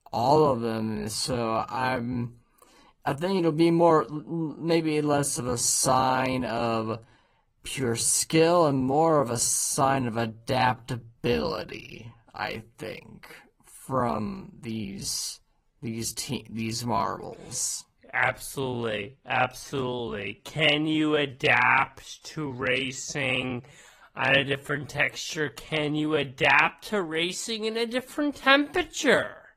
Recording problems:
wrong speed, natural pitch; too slow; 0.6 times normal speed
garbled, watery; slightly; nothing above 14.5 kHz

